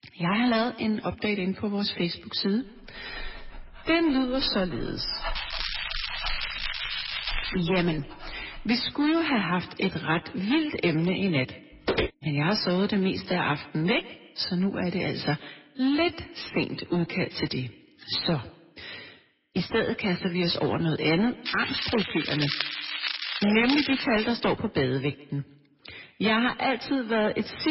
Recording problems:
garbled, watery; badly; nothing above 5.5 kHz
echo of what is said; faint; throughout; 150 ms later, 20 dB below the speech
distortion; slight; 7% of the sound clipped
crackling; loud; from 5.5 to 7.5 s and from 21 to 24 s; 3 dB below the speech
dog barking; noticeable; from 3 to 8.5 s; peak 9 dB below the speech
footsteps; noticeable; at 12 s; peak 1 dB below the speech
abrupt cut into speech; at the end

